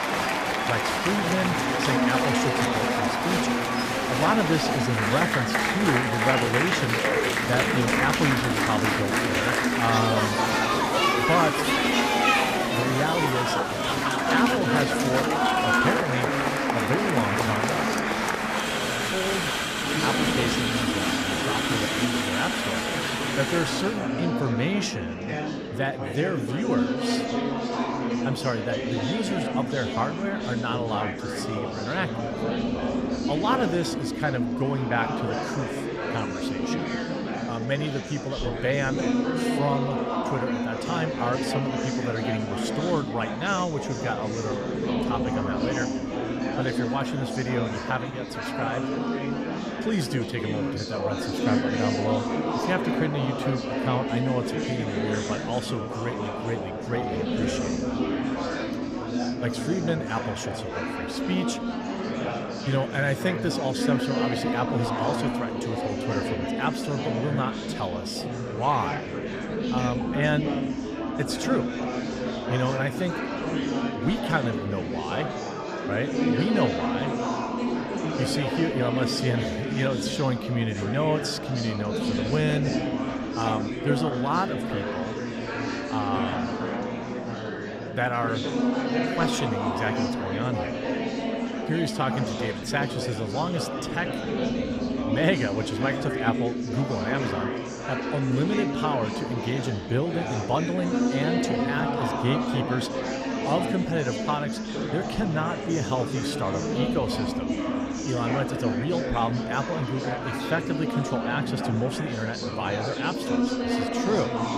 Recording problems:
murmuring crowd; very loud; throughout; 2 dB above the speech

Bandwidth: 14.5 kHz